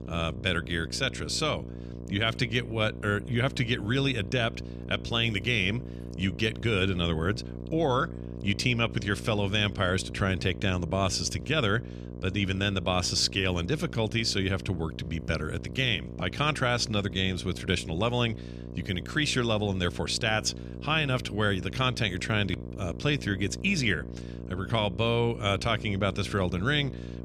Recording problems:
electrical hum; noticeable; throughout; 60 Hz, 15 dB below the speech

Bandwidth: 14.5 kHz